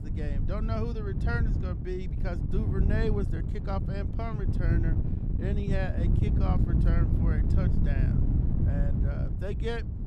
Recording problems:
wind noise on the microphone; heavy; 2 dB below the speech

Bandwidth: 14.5 kHz